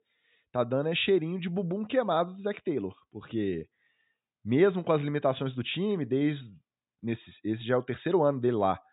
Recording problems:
high frequencies cut off; severe; nothing above 4 kHz

